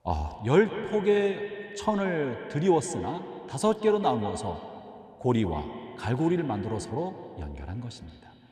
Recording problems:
echo of what is said; strong; throughout; 170 ms later, 10 dB below the speech

